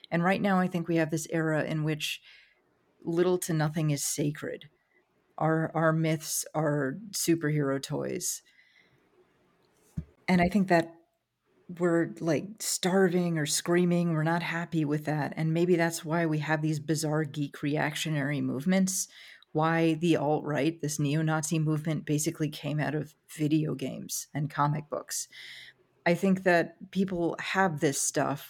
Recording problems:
none

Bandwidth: 17.5 kHz